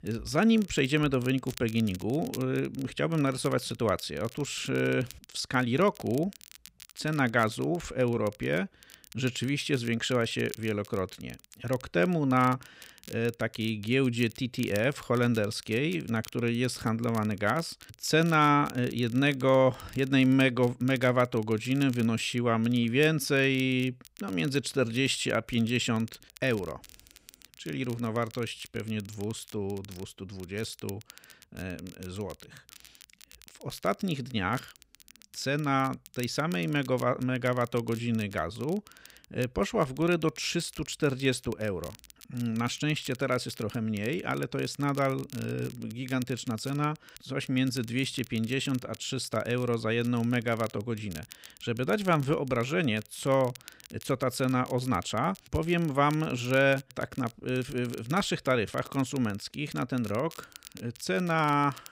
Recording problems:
crackle, like an old record; faint; 20 dB below the speech

